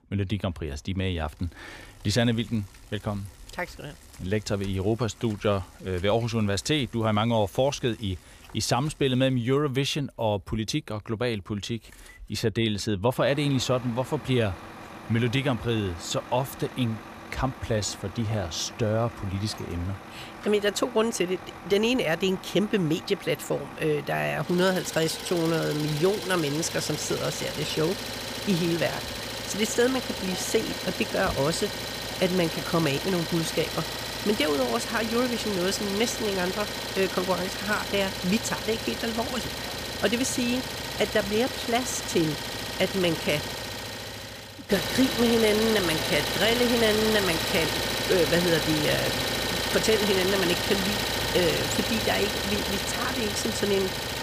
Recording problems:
traffic noise; loud; throughout; 4 dB below the speech

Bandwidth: 15 kHz